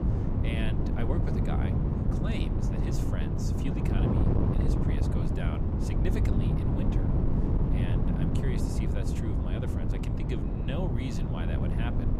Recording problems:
wind noise on the microphone; heavy; 4 dB above the speech

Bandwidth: 15 kHz